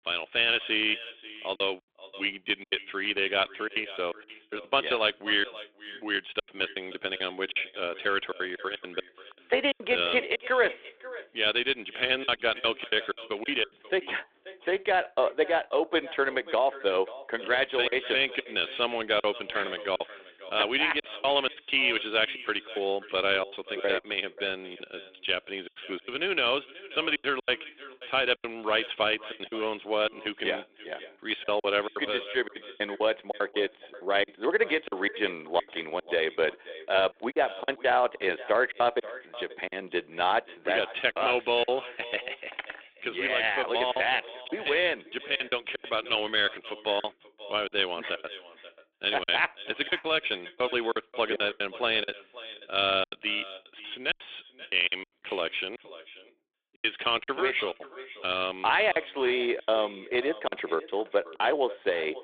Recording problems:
echo of what is said; noticeable; throughout; 530 ms later, 15 dB below the speech
phone-call audio; nothing above 3.5 kHz
choppy; very; 12% of the speech affected
clattering dishes; faint; at 43 s; peak 10 dB below the speech

